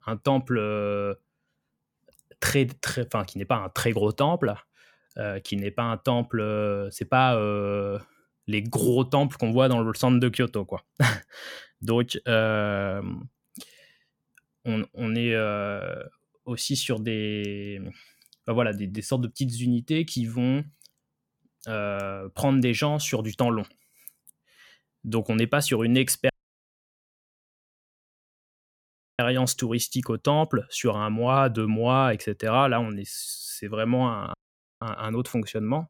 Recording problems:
audio cutting out; at 26 s for 3 s and at 34 s

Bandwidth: 18 kHz